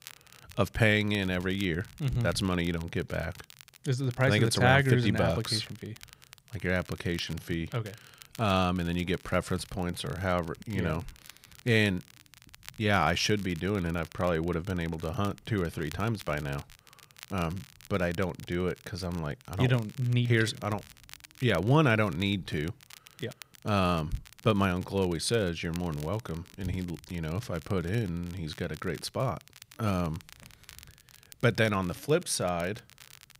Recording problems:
crackle, like an old record; faint; 20 dB below the speech

